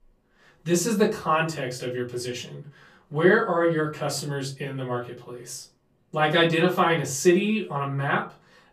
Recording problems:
off-mic speech; far
room echo; very slight; dies away in 0.3 s

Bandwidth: 14.5 kHz